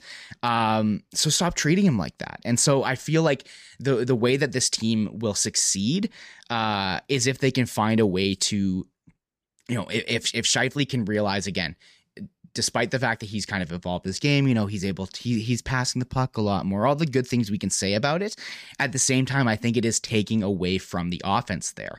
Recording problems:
none

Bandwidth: 15 kHz